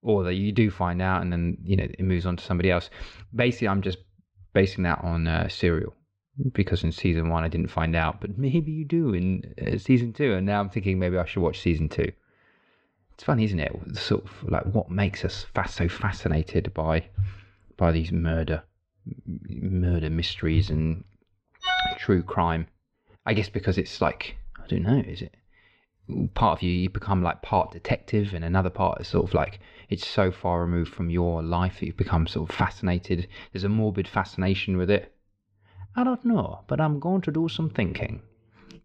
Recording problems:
muffled; very slightly; fading above 4 kHz

